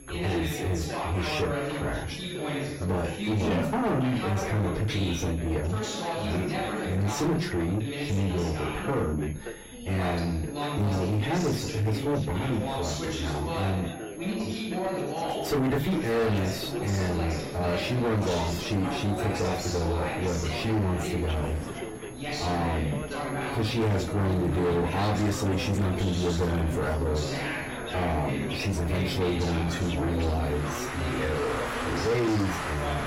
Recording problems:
distortion; heavy; 7 dB below the speech
off-mic speech; far
room echo; very slight; dies away in 0.2 s
garbled, watery; slightly; nothing above 16 kHz
background chatter; loud; throughout; 4 voices, 4 dB below the speech
traffic noise; noticeable; throughout; 10 dB below the speech
high-pitched whine; faint; throughout; 11 kHz, 25 dB below the speech

